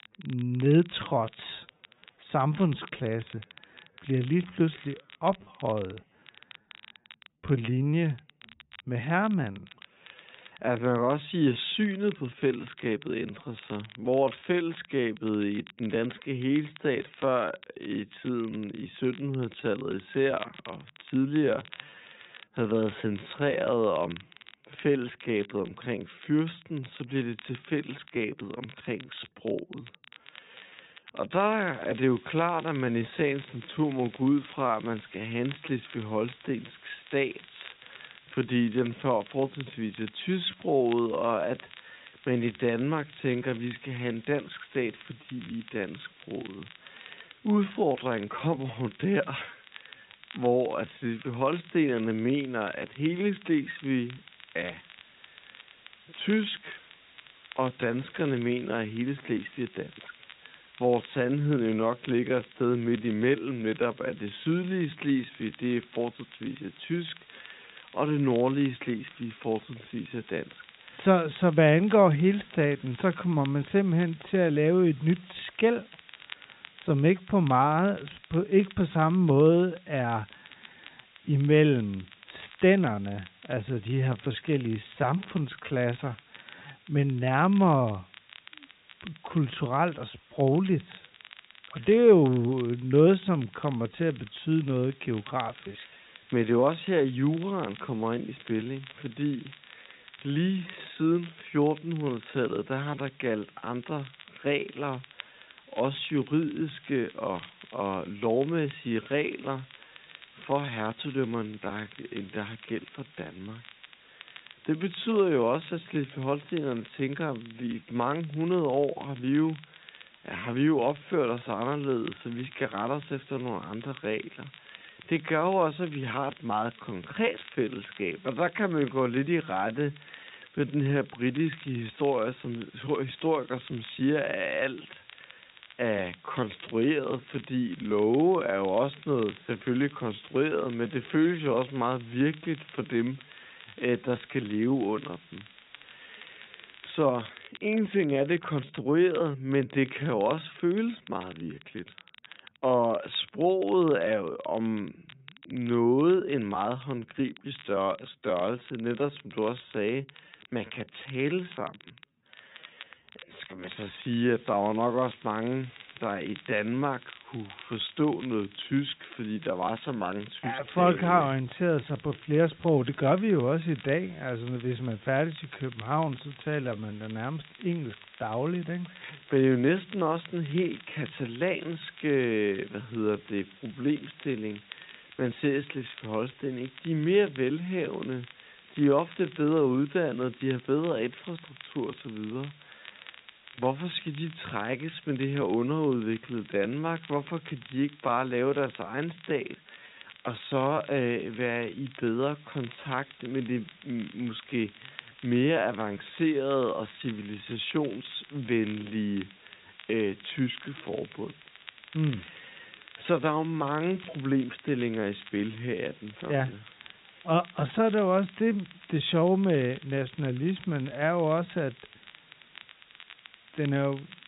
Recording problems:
high frequencies cut off; severe; nothing above 4 kHz
wrong speed, natural pitch; too slow; 0.6 times normal speed
hiss; faint; from 32 s to 2:27 and from 2:44 on; 25 dB below the speech
crackle, like an old record; faint; 20 dB below the speech

